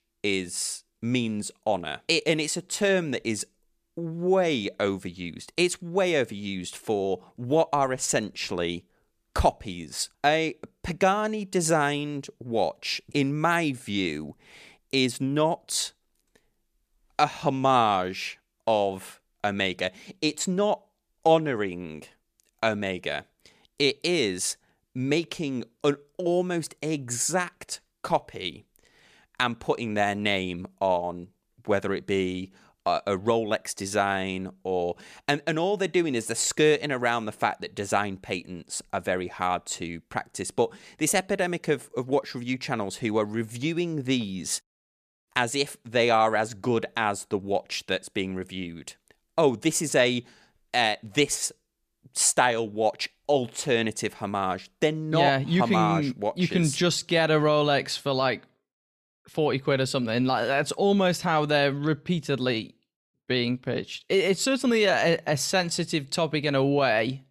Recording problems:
none

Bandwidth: 14.5 kHz